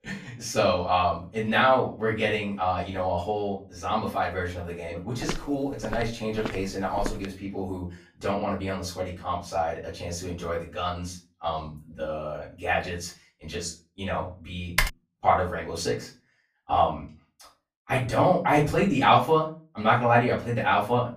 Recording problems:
off-mic speech; far
room echo; slight; dies away in 0.3 s
footsteps; noticeable; from 5 to 7.5 s; peak 9 dB below the speech
keyboard typing; loud; at 15 s; peak level with the speech

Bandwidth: 15 kHz